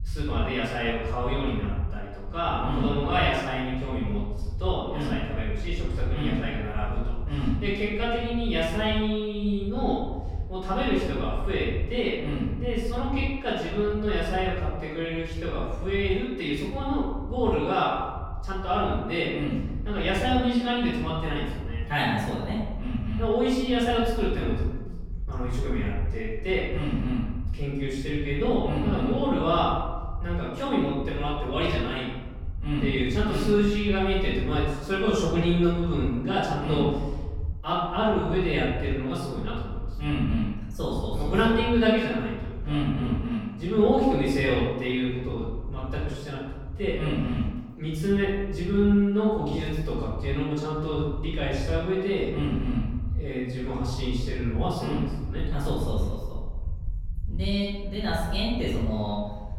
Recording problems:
off-mic speech; far
room echo; noticeable; dies away in 1.1 s
low rumble; faint; throughout; 25 dB below the speech

